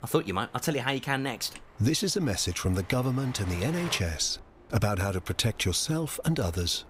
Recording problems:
train or aircraft noise; noticeable; throughout; 20 dB below the speech

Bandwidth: 15.5 kHz